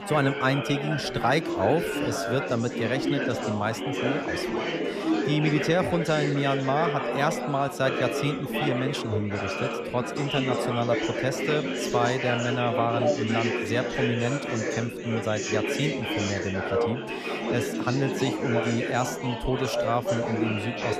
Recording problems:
chatter from many people; loud; throughout; 1 dB below the speech

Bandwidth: 14.5 kHz